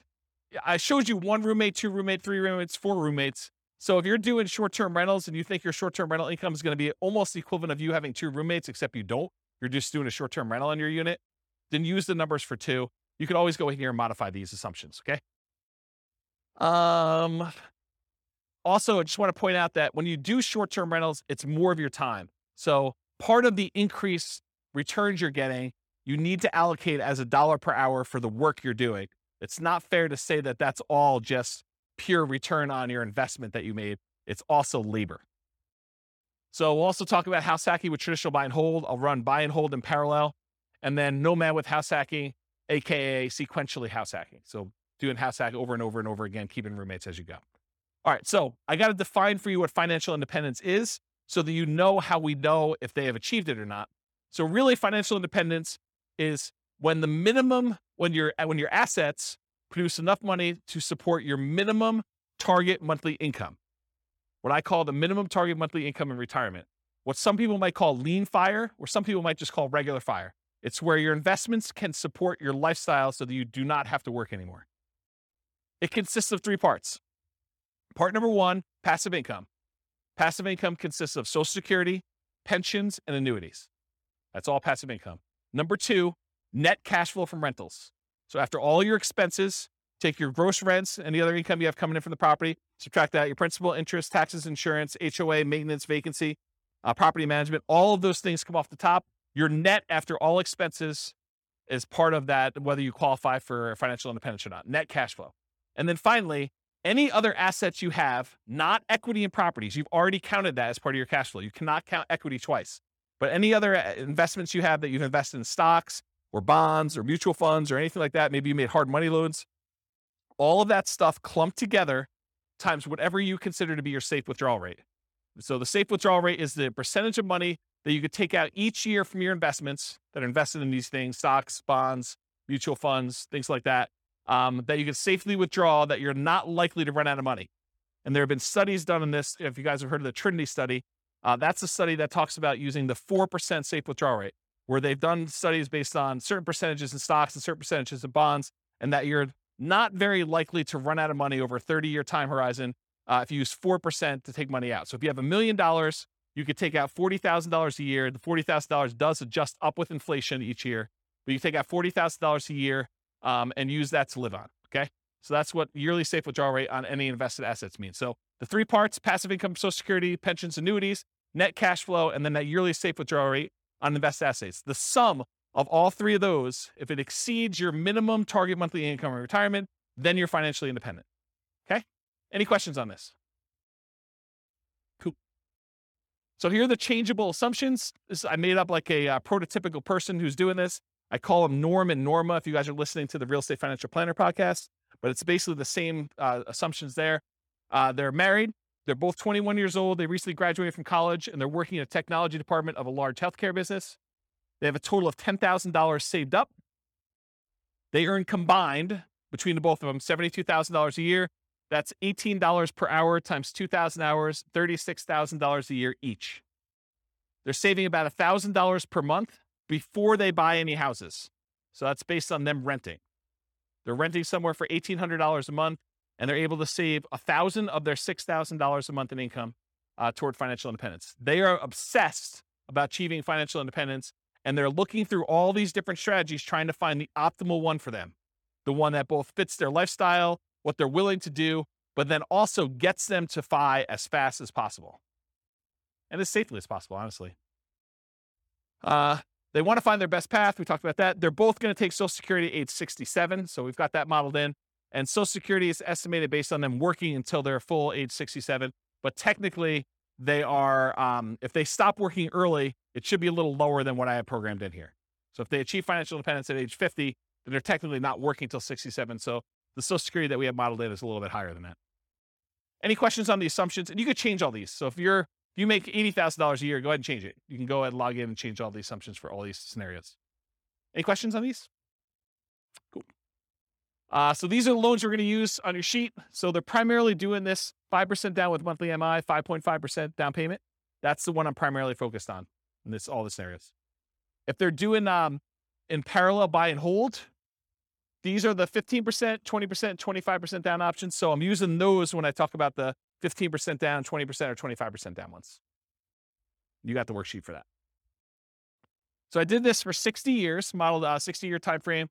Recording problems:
none

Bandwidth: 18 kHz